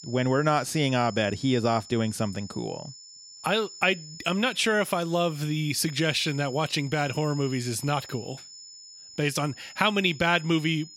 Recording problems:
high-pitched whine; noticeable; throughout; 5.5 kHz, 15 dB below the speech

